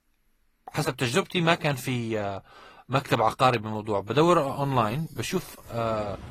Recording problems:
garbled, watery; slightly
traffic noise; very faint; from 4 s on; 20 dB below the speech

